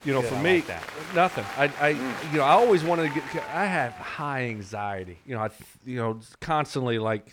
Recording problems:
crowd noise; noticeable; throughout; 10 dB below the speech

